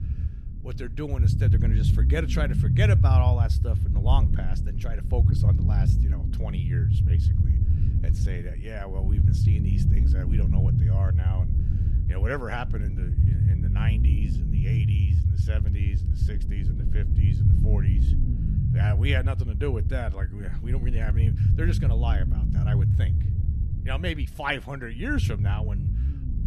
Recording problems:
low rumble; loud; throughout; 3 dB below the speech

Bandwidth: 14 kHz